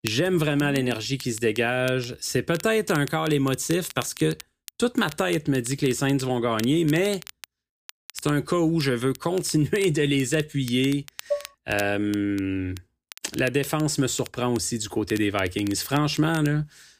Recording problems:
crackle, like an old record; noticeable; 20 dB below the speech
clattering dishes; noticeable; at 11 s; peak 6 dB below the speech

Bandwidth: 15 kHz